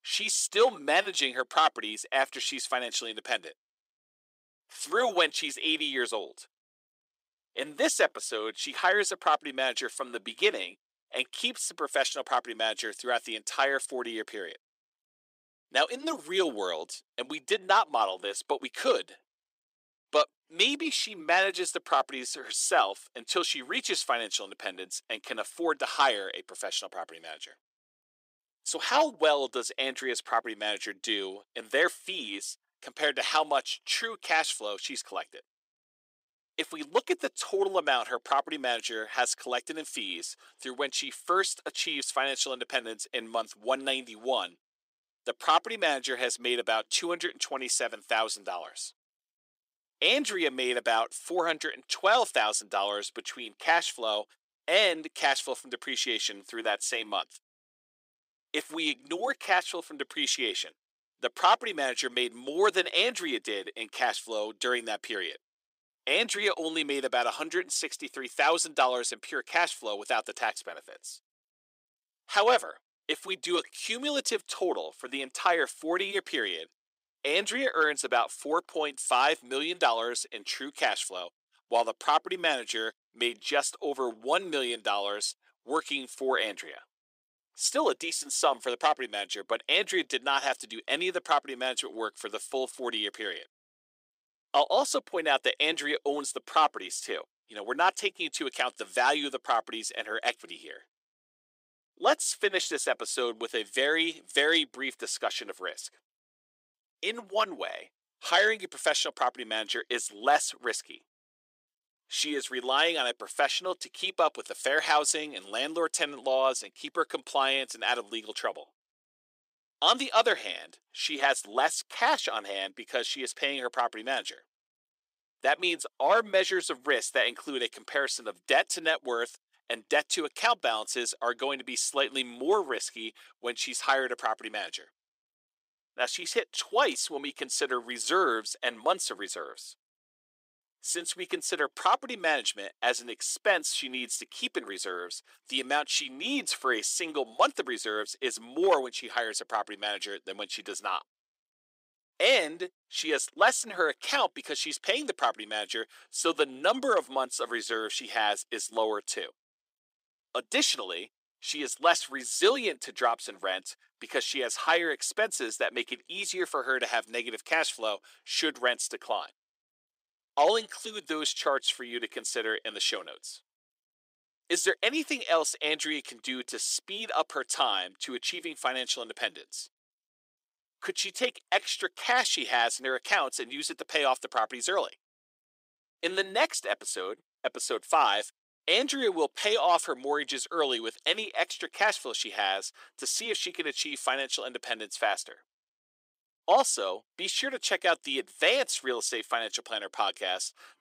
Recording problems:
thin; somewhat; fading below 350 Hz

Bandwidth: 15.5 kHz